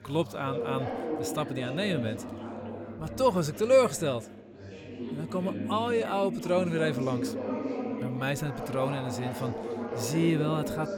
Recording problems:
background chatter; loud; throughout; 4 voices, 6 dB below the speech

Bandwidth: 17 kHz